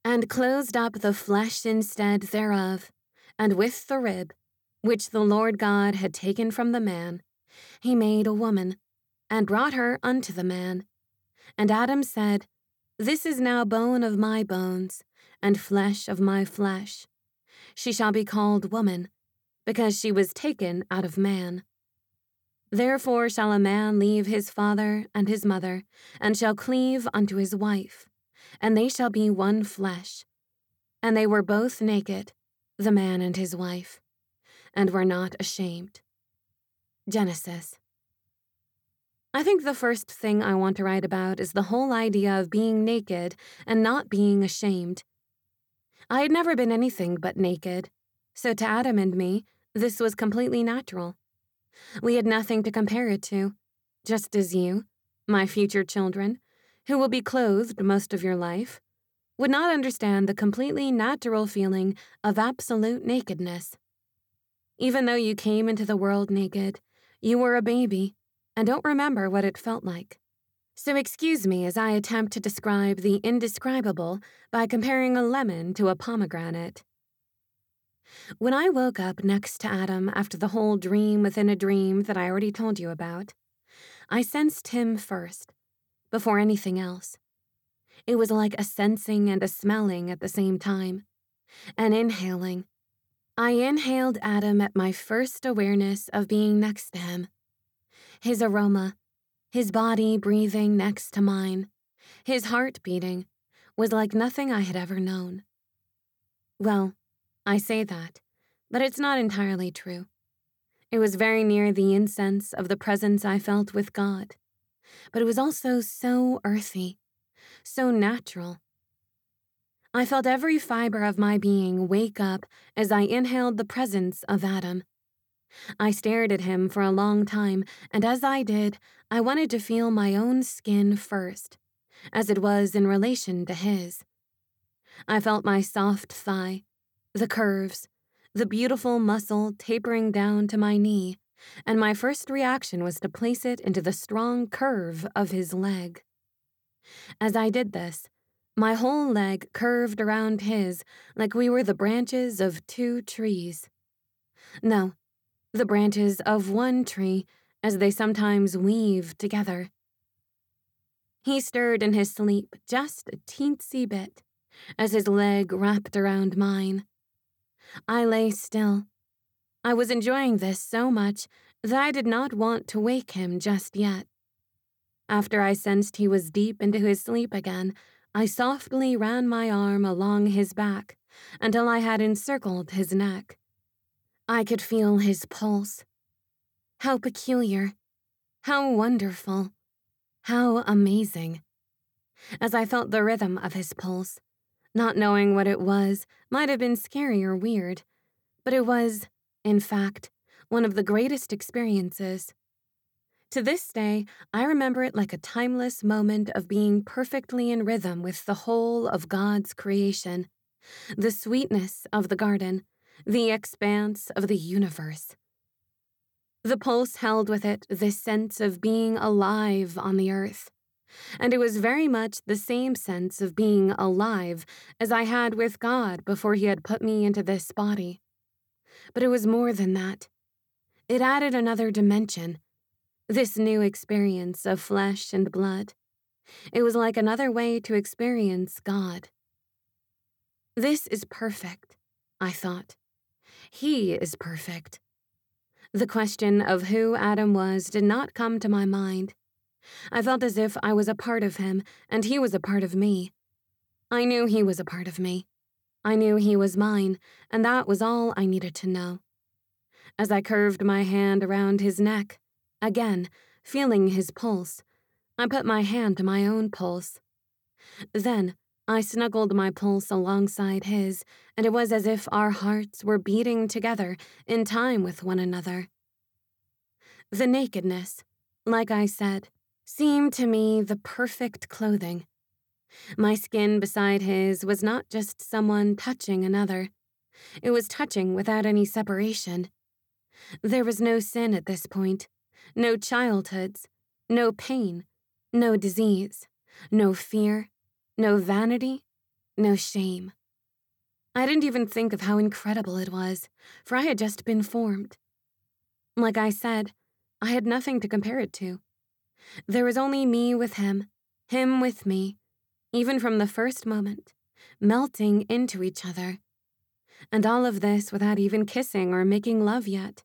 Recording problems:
none

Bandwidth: 18.5 kHz